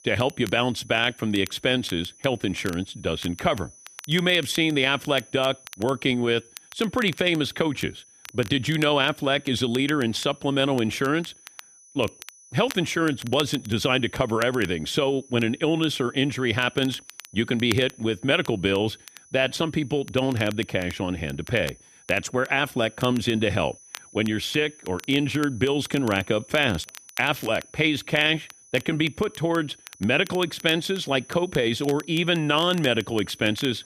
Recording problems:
crackle, like an old record; noticeable; 20 dB below the speech
high-pitched whine; faint; throughout; 6 kHz, 25 dB below the speech

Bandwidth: 14.5 kHz